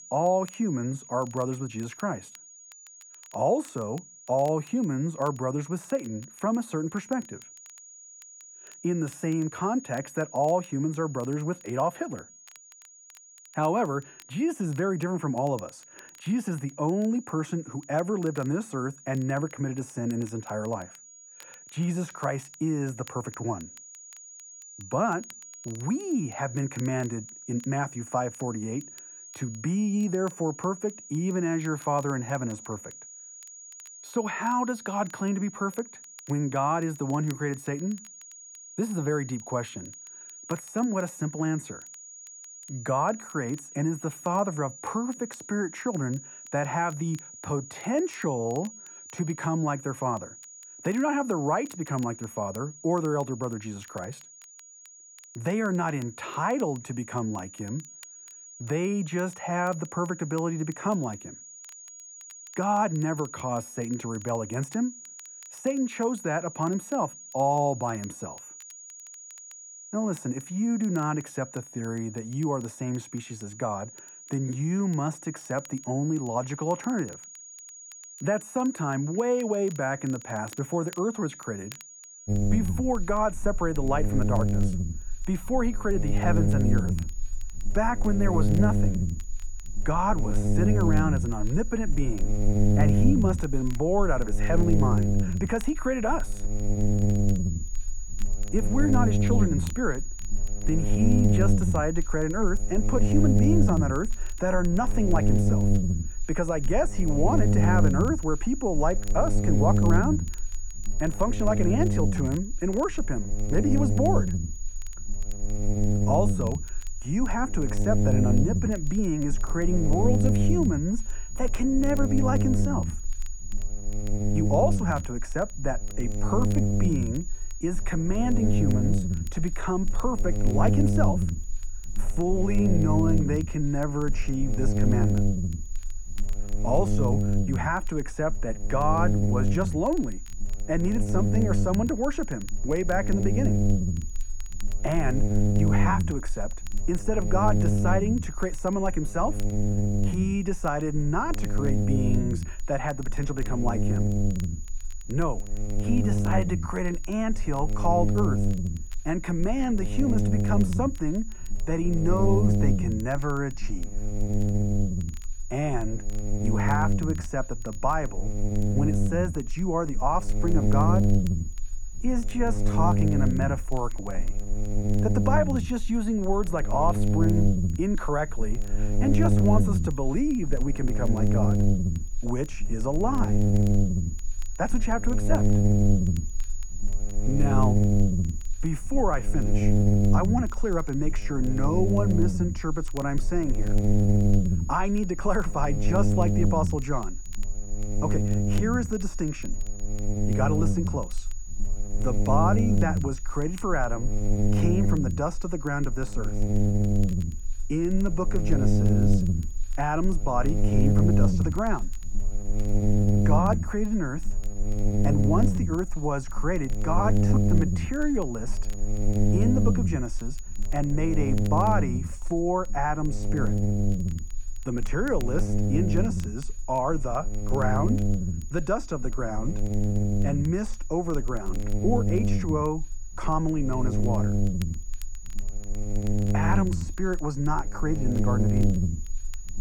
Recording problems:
muffled; slightly; fading above 1.5 kHz
electrical hum; loud; from 1:22 on; 60 Hz, 5 dB below the speech
high-pitched whine; noticeable; throughout; 6.5 kHz, 15 dB below the speech
crackle, like an old record; faint; 25 dB below the speech

